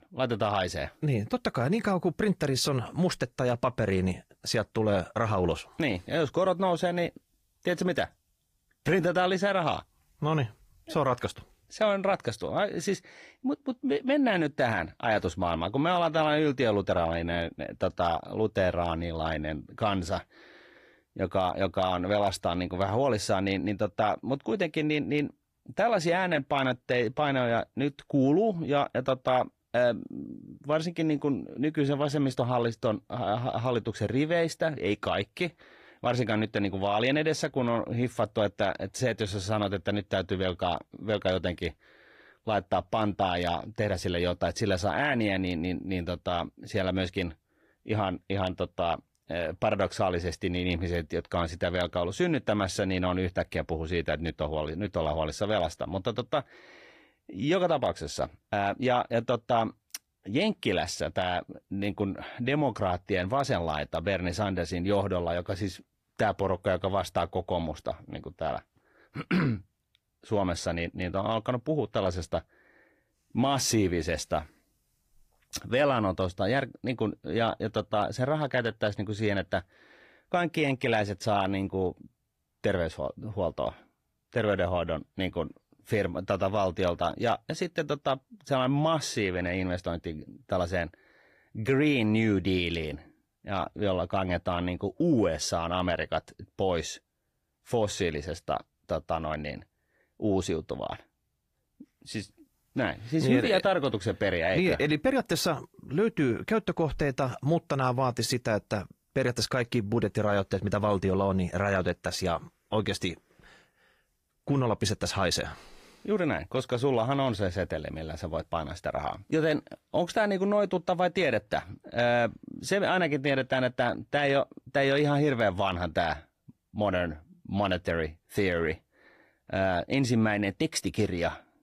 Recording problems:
garbled, watery; slightly; nothing above 15 kHz

